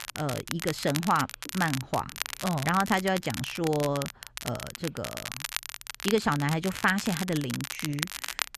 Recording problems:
crackle, like an old record; loud; 7 dB below the speech

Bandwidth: 13.5 kHz